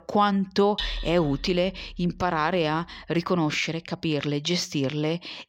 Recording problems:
machinery noise; noticeable; until 1.5 s; 10 dB below the speech

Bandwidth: 16 kHz